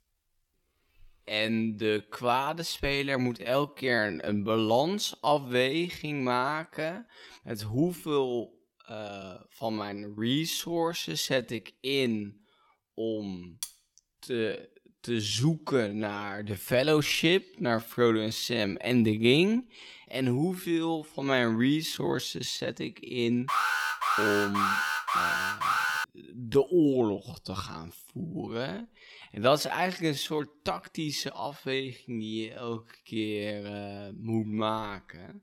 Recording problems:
wrong speed, natural pitch; too slow; 0.6 times normal speed
clattering dishes; faint; at 14 s; peak 10 dB below the speech
alarm; loud; from 23 to 26 s; peak 3 dB above the speech

